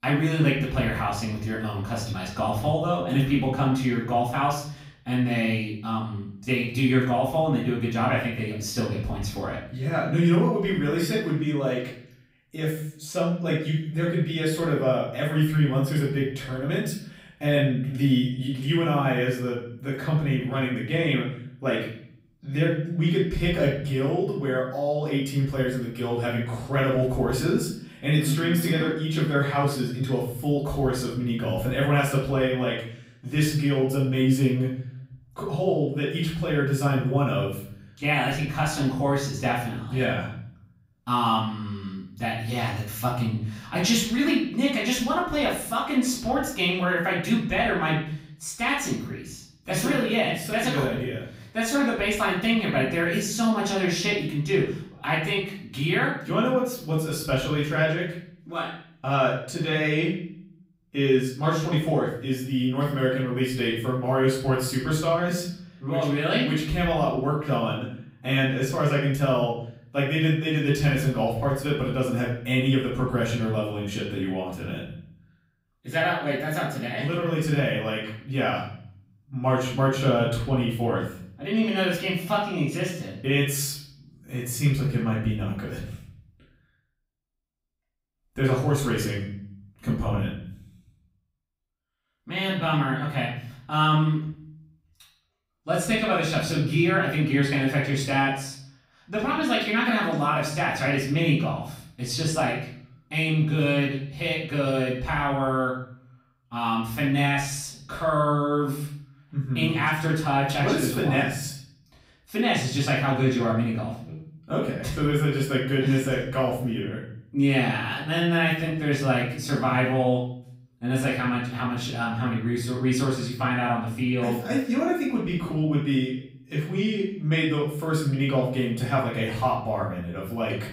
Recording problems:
off-mic speech; far
room echo; noticeable; dies away in 0.6 s

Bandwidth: 15.5 kHz